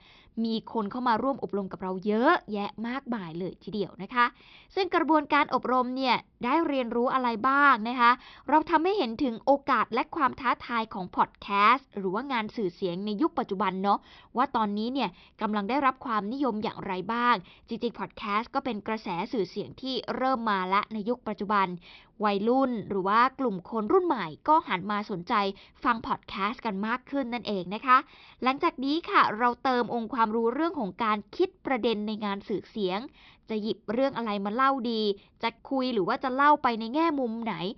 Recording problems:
high frequencies cut off; noticeable; nothing above 5.5 kHz

